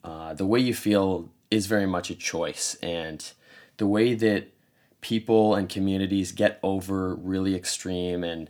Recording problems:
none

